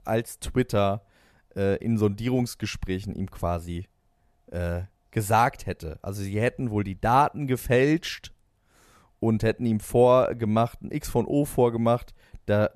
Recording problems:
none

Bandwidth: 14 kHz